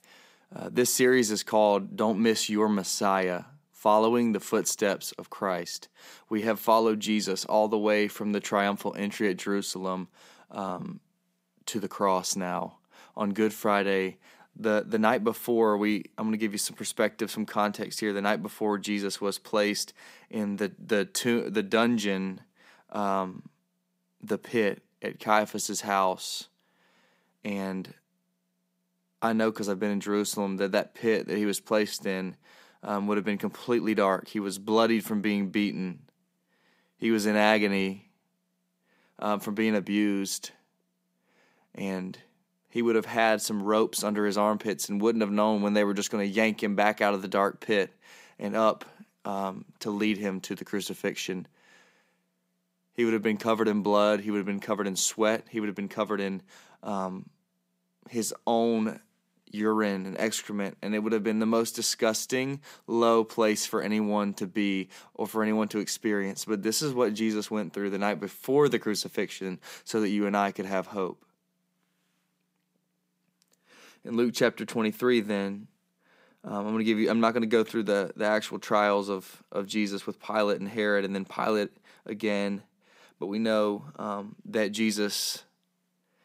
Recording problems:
none

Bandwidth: 15.5 kHz